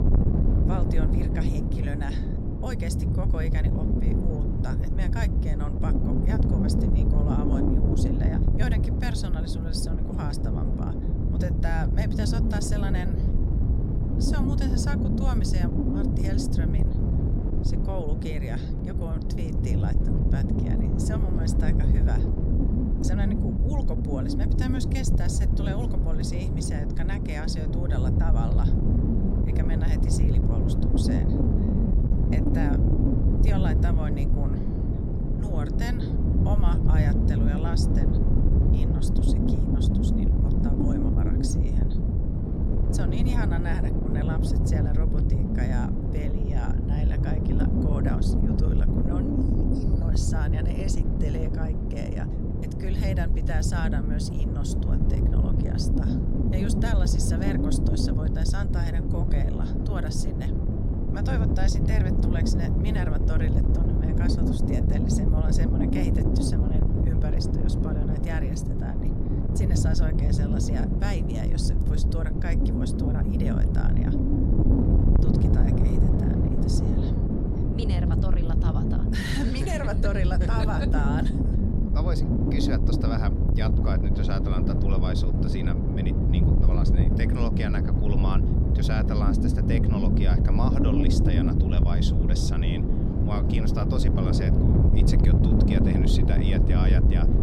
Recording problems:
wind noise on the microphone; heavy; 3 dB above the speech

